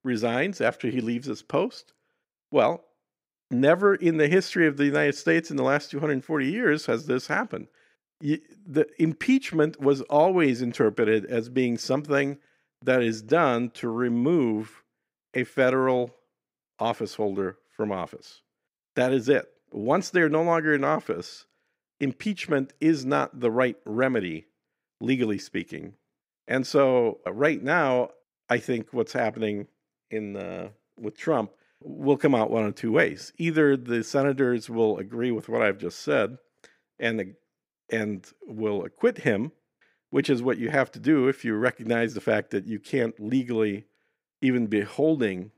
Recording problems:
none

